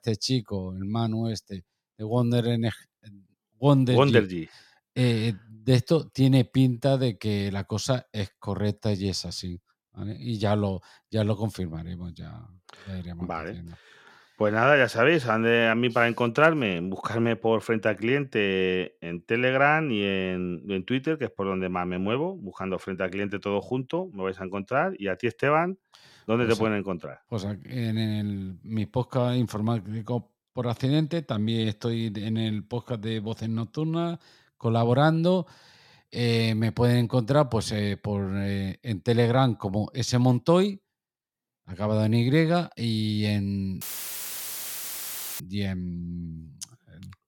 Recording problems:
audio cutting out; filled with static; at 44 s for 1.5 s

